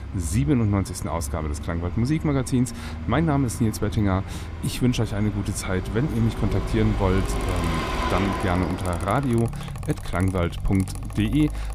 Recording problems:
traffic noise; loud; throughout; 7 dB below the speech
machinery noise; noticeable; throughout; 15 dB below the speech

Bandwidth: 15 kHz